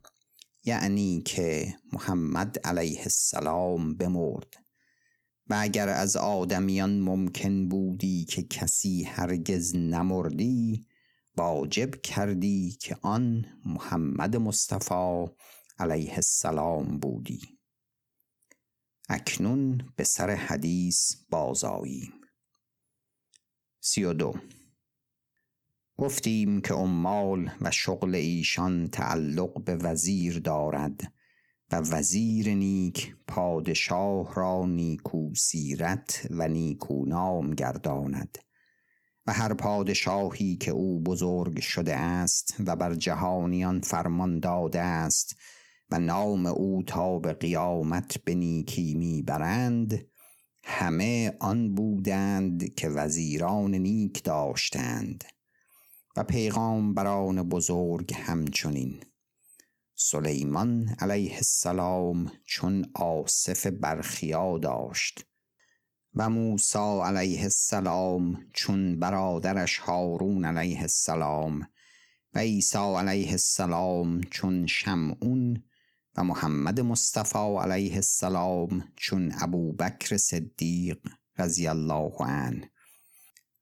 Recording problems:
squashed, flat; heavily

